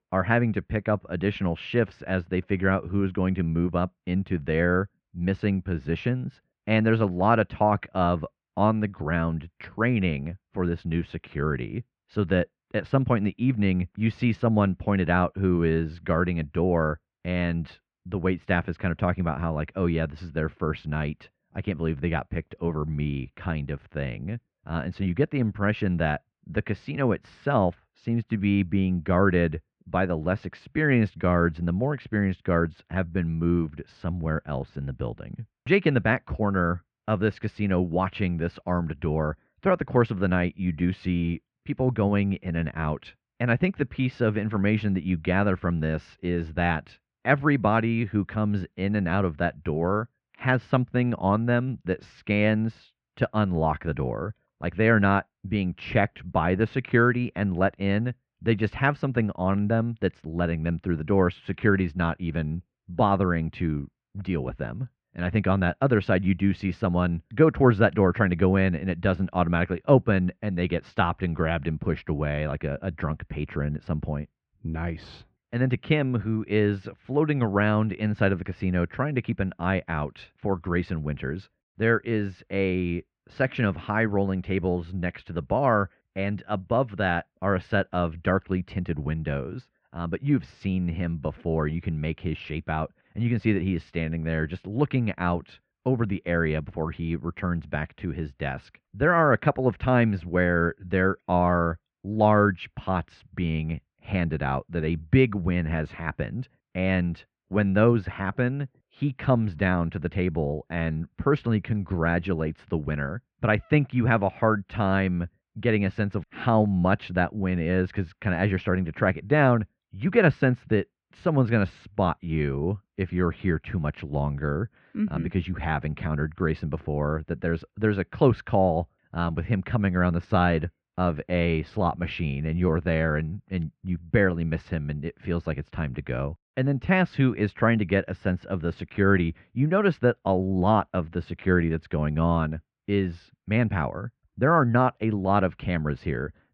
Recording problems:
muffled; very; fading above 2.5 kHz

